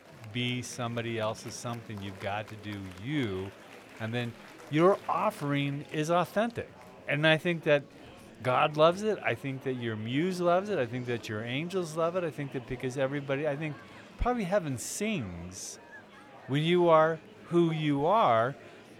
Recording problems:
murmuring crowd; faint; throughout; 20 dB below the speech

